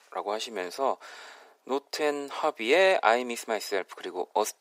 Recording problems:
thin; very; fading below 400 Hz

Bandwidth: 15.5 kHz